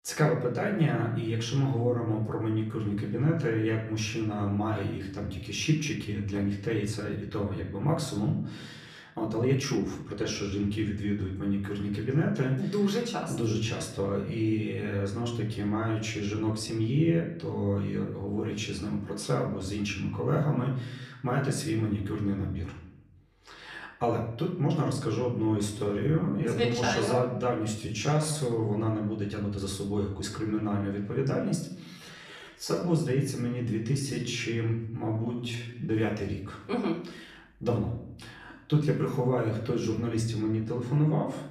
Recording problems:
off-mic speech; far
room echo; slight; dies away in 0.6 s
uneven, jittery; strongly; from 6 to 38 s

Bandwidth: 14 kHz